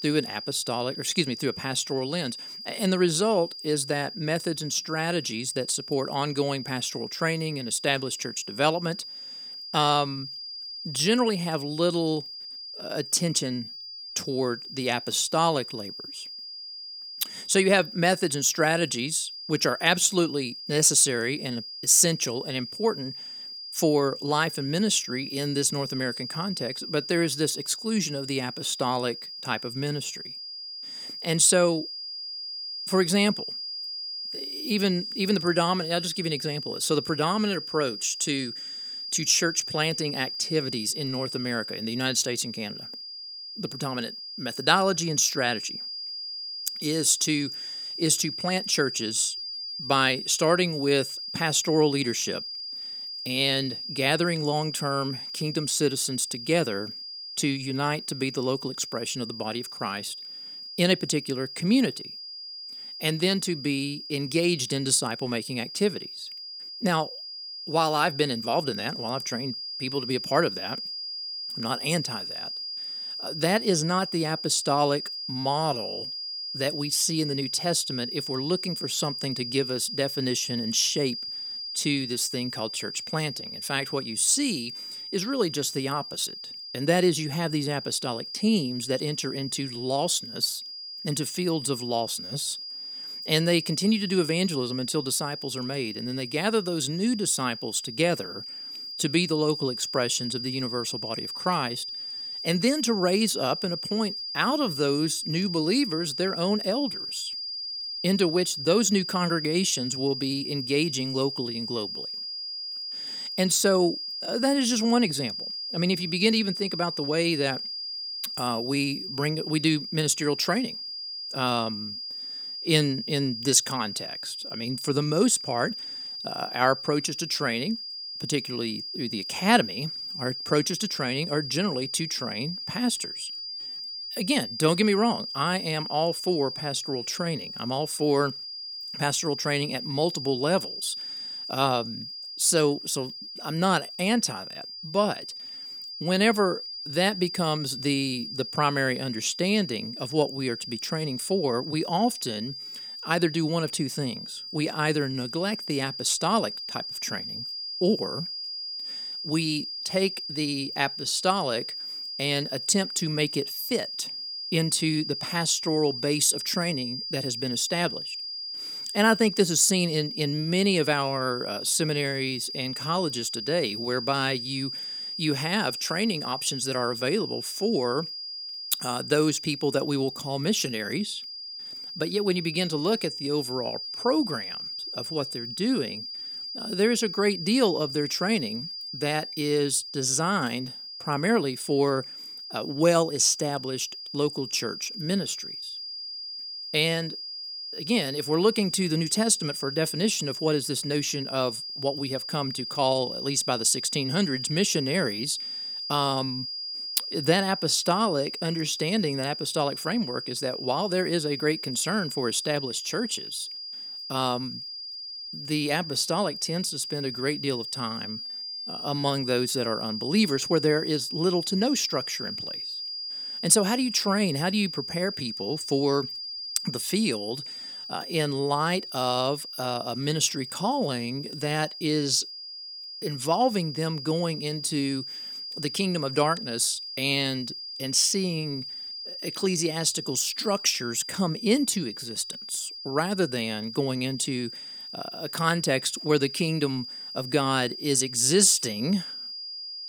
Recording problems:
high-pitched whine; loud; throughout; 5 kHz, 7 dB below the speech

